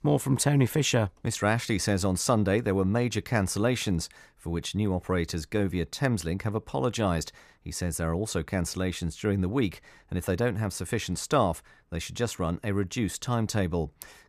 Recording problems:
none

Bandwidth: 14.5 kHz